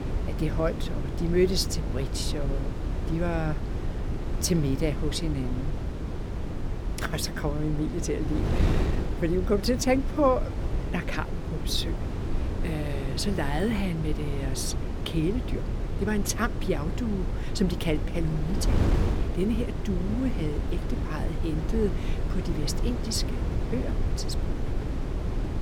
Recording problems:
wind noise on the microphone; heavy; 7 dB below the speech

